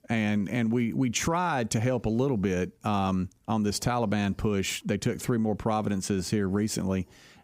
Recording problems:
squashed, flat; somewhat

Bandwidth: 15.5 kHz